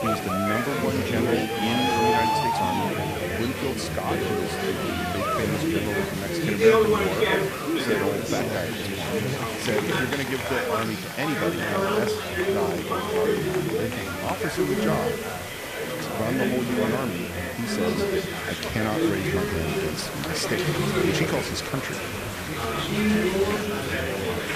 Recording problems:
chatter from many people; very loud; throughout; 5 dB above the speech
hiss; loud; throughout; 8 dB below the speech

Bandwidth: 14.5 kHz